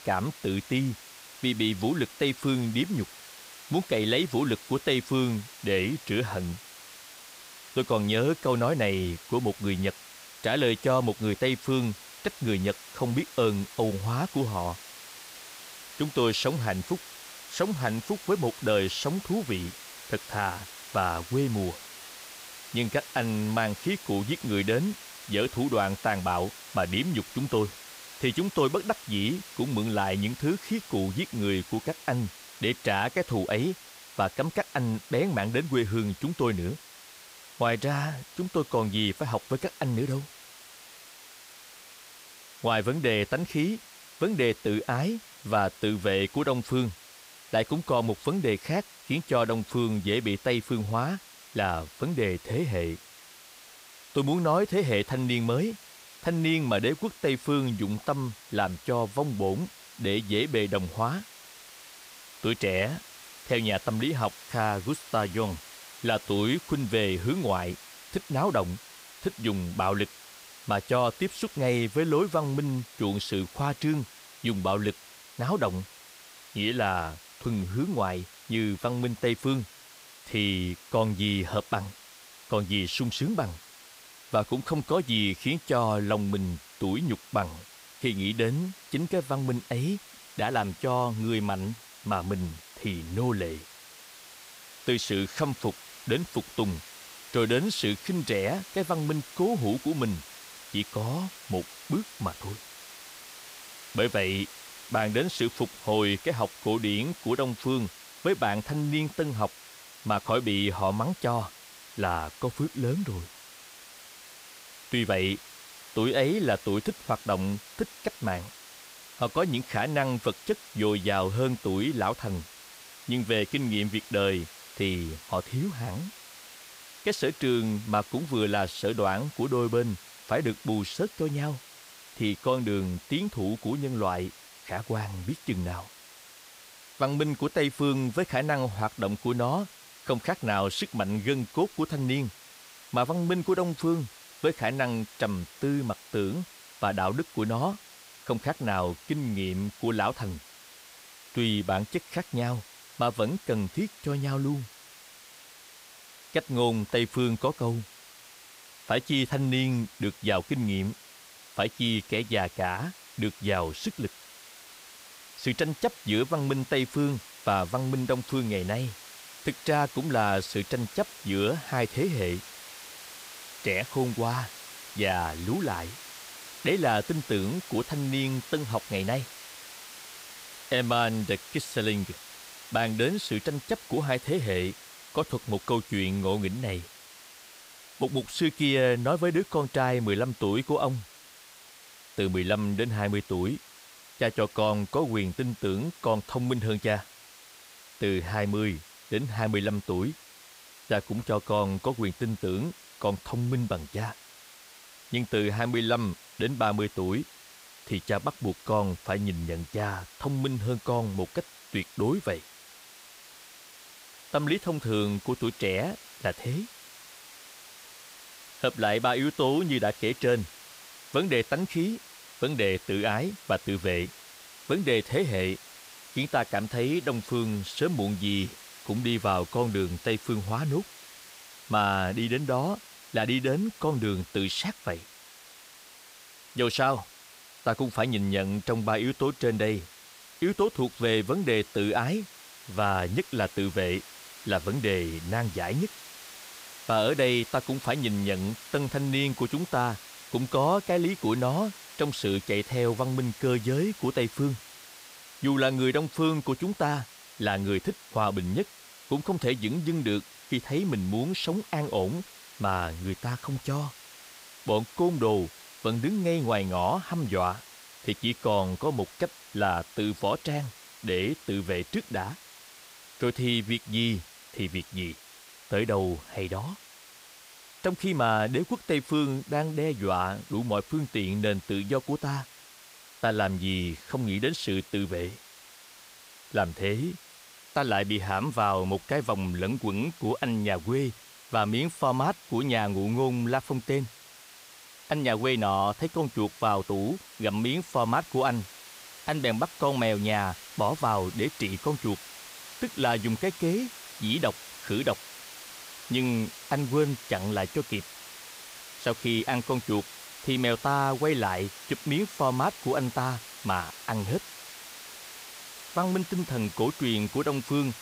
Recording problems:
hiss; noticeable; throughout; 15 dB below the speech

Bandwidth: 15.5 kHz